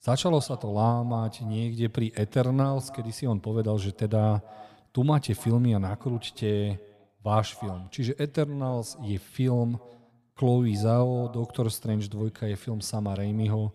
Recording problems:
echo of what is said; faint; throughout; 290 ms later, 25 dB below the speech

